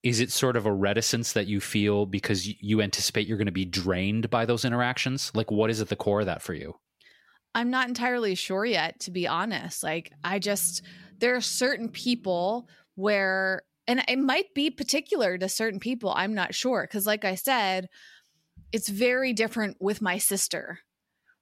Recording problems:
none

